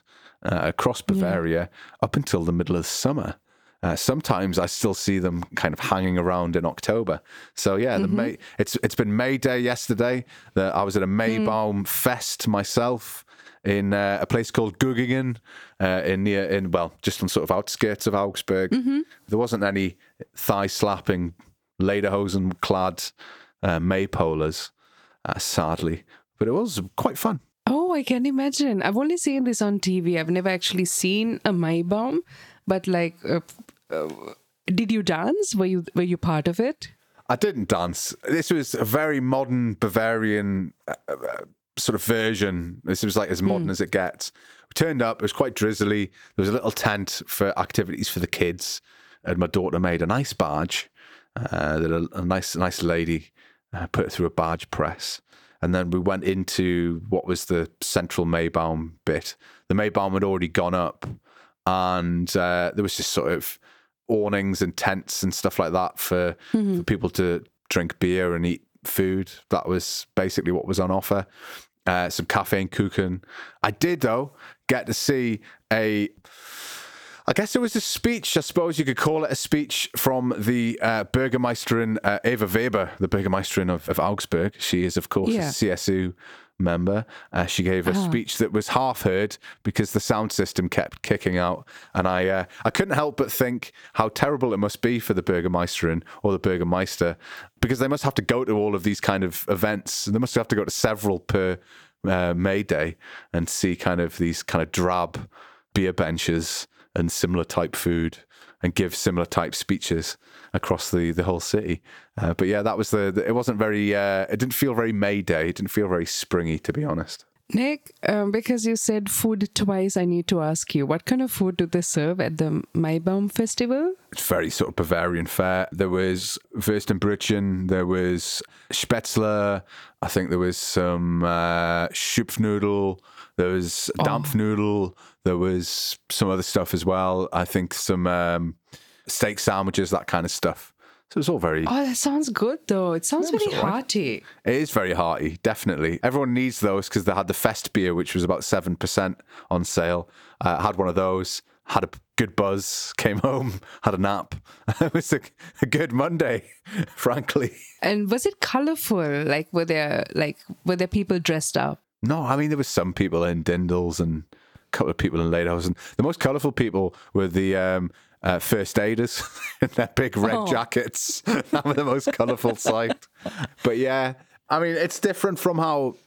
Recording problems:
squashed, flat; somewhat

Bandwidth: 18.5 kHz